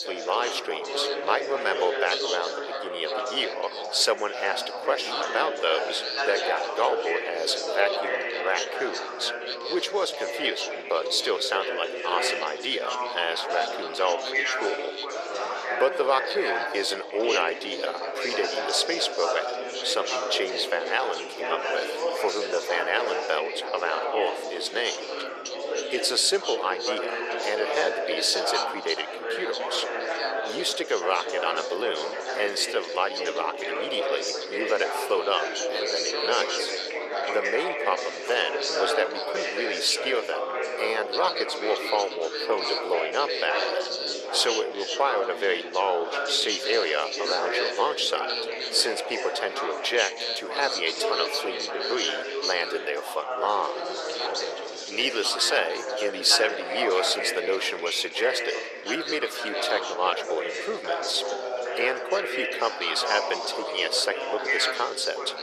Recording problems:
thin; very; fading below 450 Hz
chatter from many people; loud; throughout; 2 dB below the speech

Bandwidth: 14 kHz